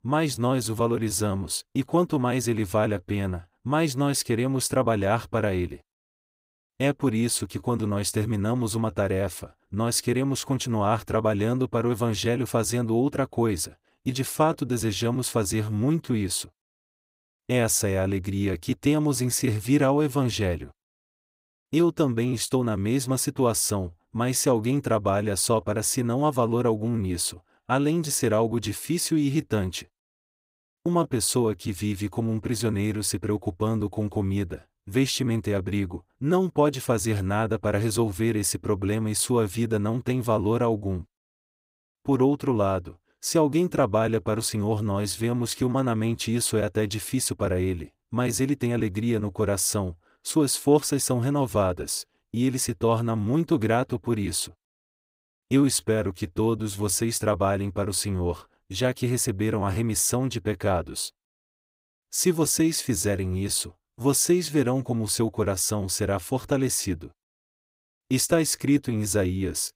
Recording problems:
none

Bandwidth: 15.5 kHz